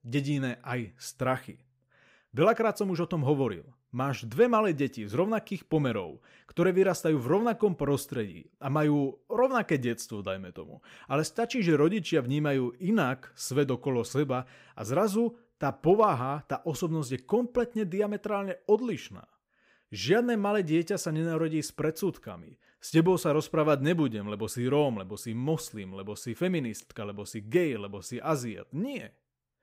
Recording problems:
none

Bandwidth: 15.5 kHz